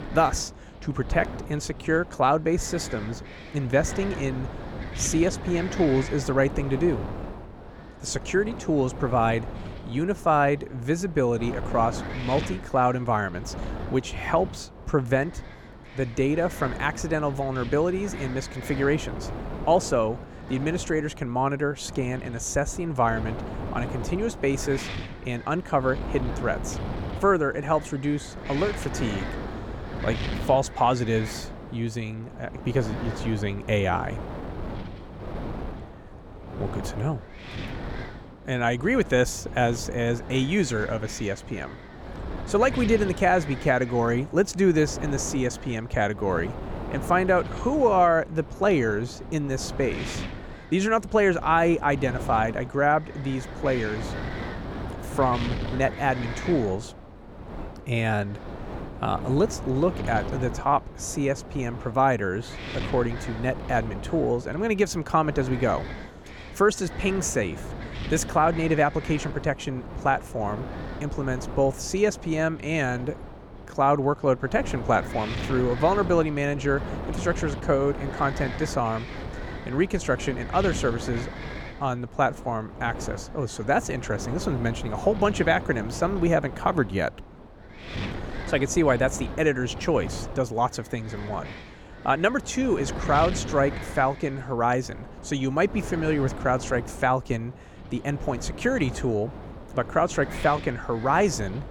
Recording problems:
wind noise on the microphone; occasional gusts; 15 dB below the speech

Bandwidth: 17.5 kHz